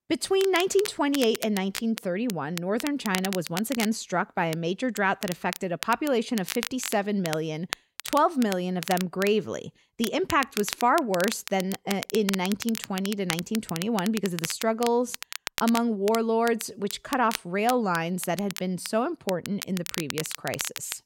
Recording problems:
crackle, like an old record; loud; 9 dB below the speech

